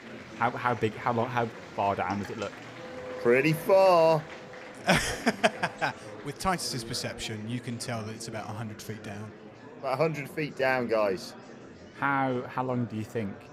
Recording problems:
animal sounds; noticeable; throughout; 20 dB below the speech
murmuring crowd; noticeable; throughout; 15 dB below the speech

